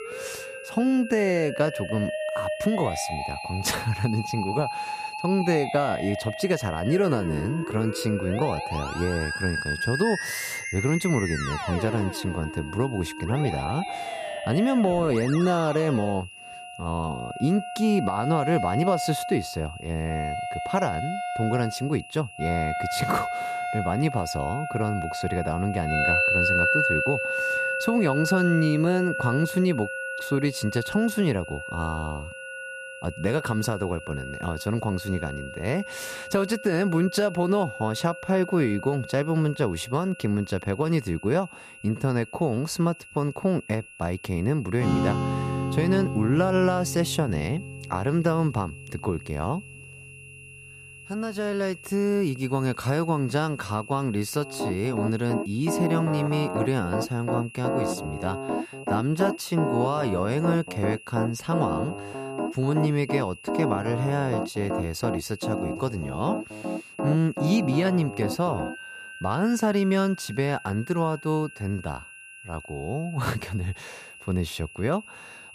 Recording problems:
background music; loud; throughout; 4 dB below the speech
high-pitched whine; noticeable; throughout; 2.5 kHz, 15 dB below the speech

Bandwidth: 14.5 kHz